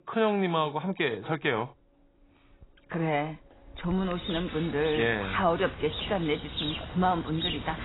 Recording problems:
garbled, watery; badly; nothing above 4 kHz
animal sounds; loud; throughout; 8 dB below the speech

